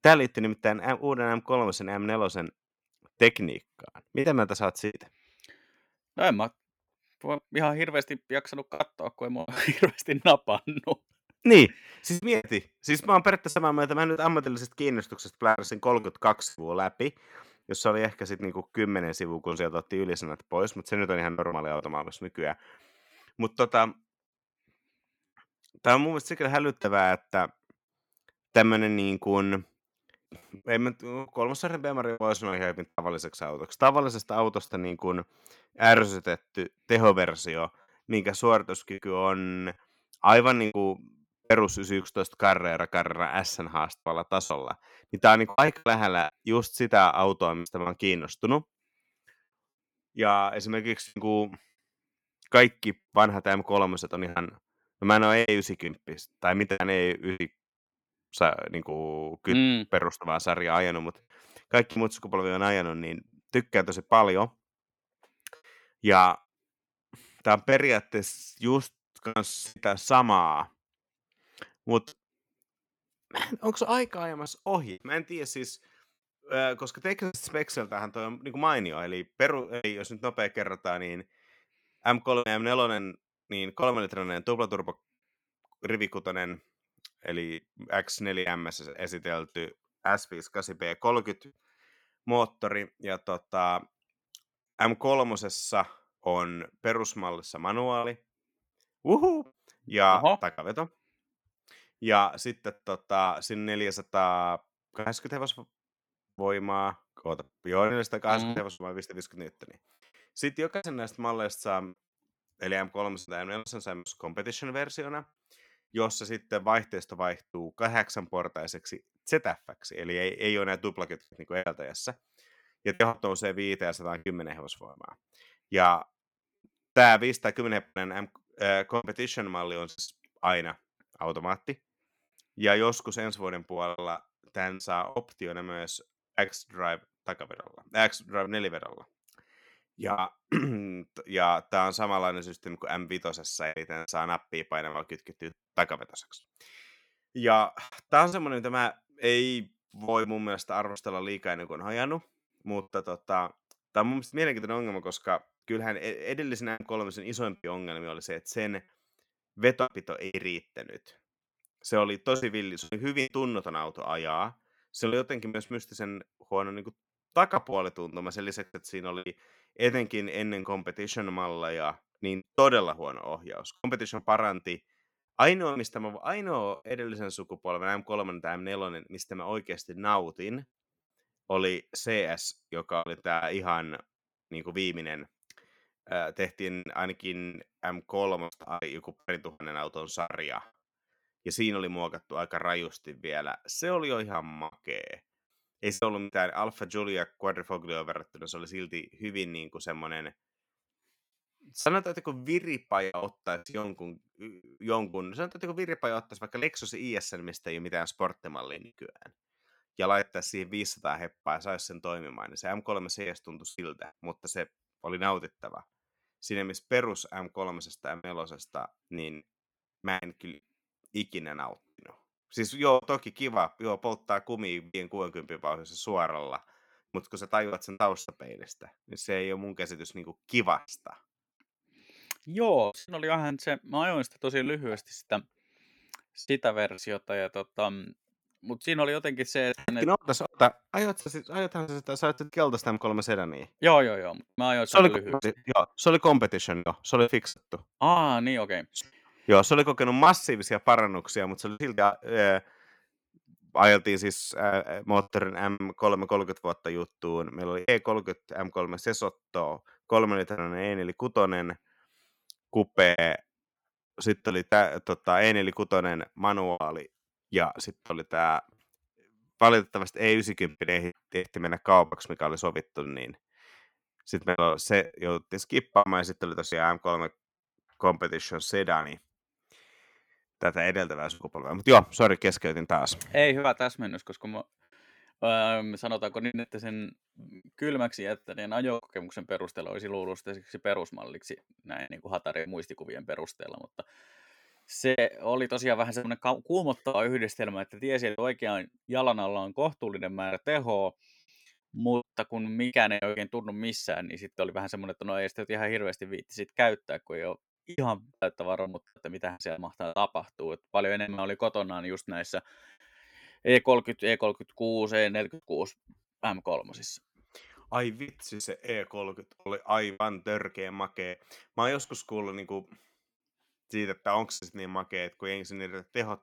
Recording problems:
choppy; very; 6% of the speech affected

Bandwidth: 18.5 kHz